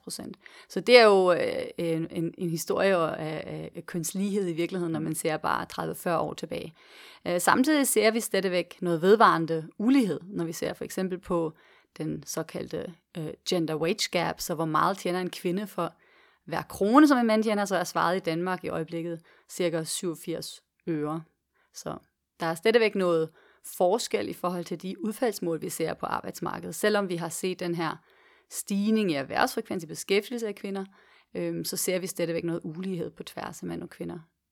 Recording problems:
none

